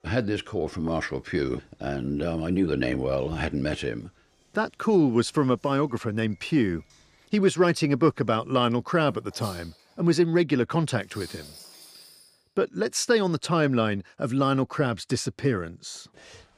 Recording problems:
household noises; faint; until 12 s; 25 dB below the speech

